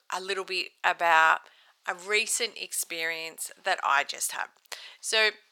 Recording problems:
thin; very; fading below 900 Hz

